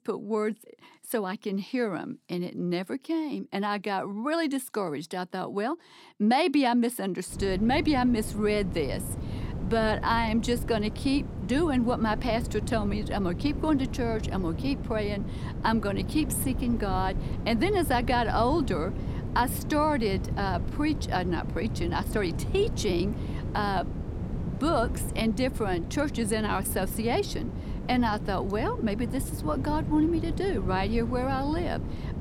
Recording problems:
wind noise on the microphone; occasional gusts; from 7.5 s on; 15 dB below the speech

